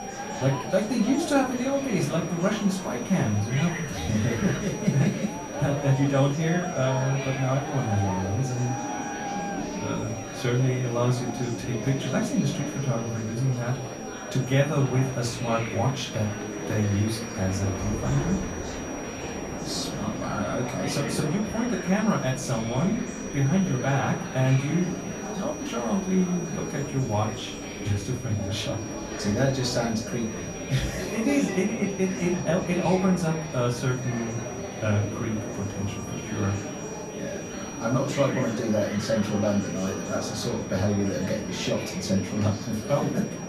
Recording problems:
off-mic speech; far
room echo; slight; dies away in 0.3 s
murmuring crowd; loud; throughout; 8 dB below the speech
high-pitched whine; noticeable; throughout; 6 kHz, 15 dB below the speech
rain or running water; noticeable; throughout; 20 dB below the speech
hiss; noticeable; throughout; 20 dB below the speech

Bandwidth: 14.5 kHz